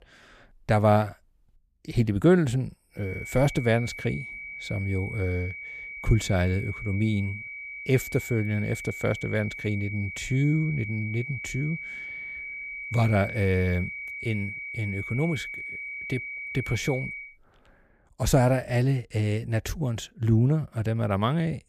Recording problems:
high-pitched whine; loud; from 3 to 17 s; 2.5 kHz, 8 dB below the speech

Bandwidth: 15 kHz